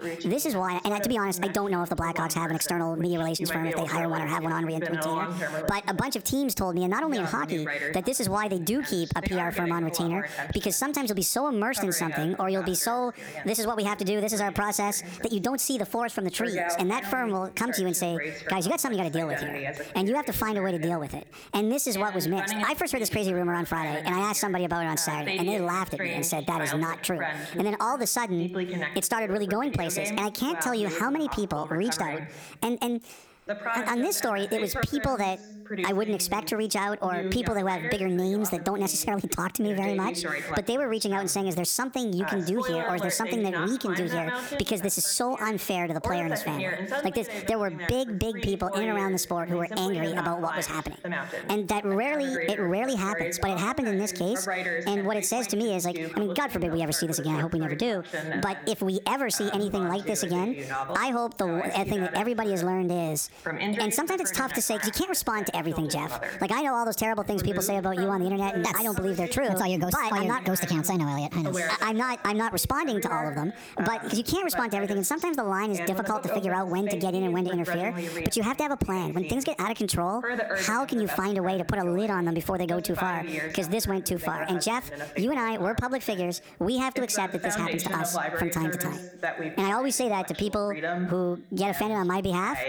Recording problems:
squashed, flat; heavily, background pumping
wrong speed and pitch; too fast and too high; 1.5 times normal speed
voice in the background; loud; throughout; 7 dB below the speech

